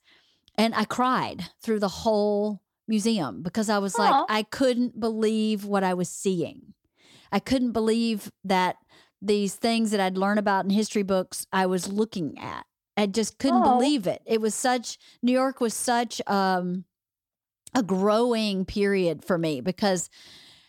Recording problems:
none

